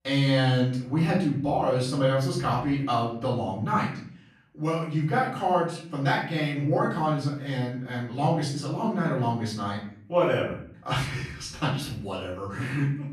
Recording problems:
off-mic speech; far
room echo; noticeable; dies away in 0.6 s

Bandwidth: 14 kHz